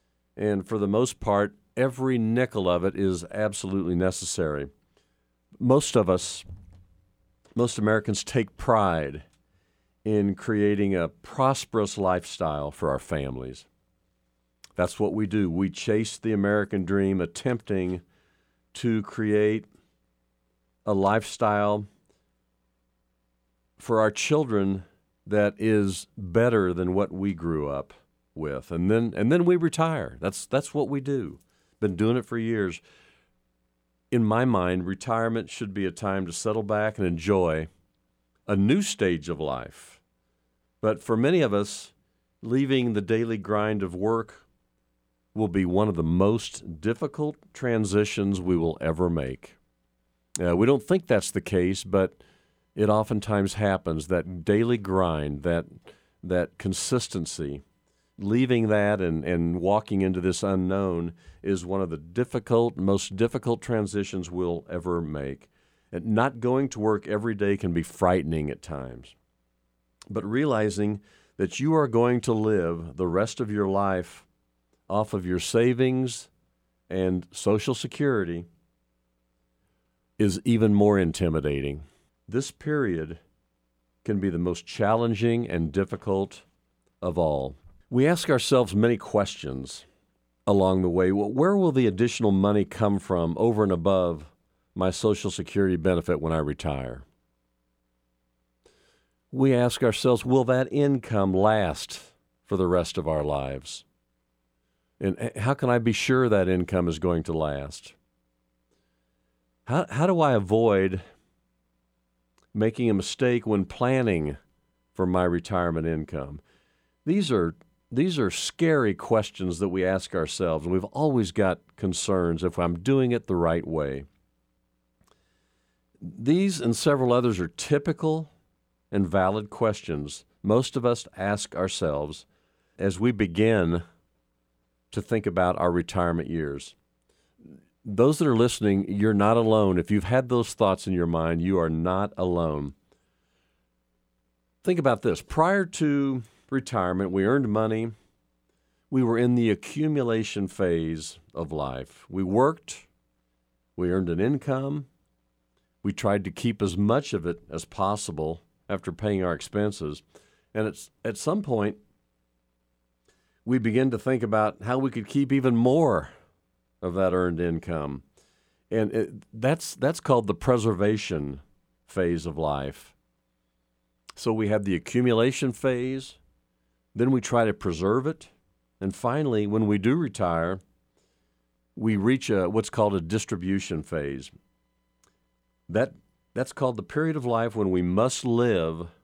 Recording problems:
none

